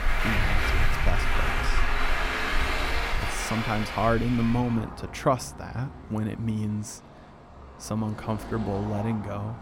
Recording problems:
traffic noise; very loud; throughout; as loud as the speech

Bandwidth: 16.5 kHz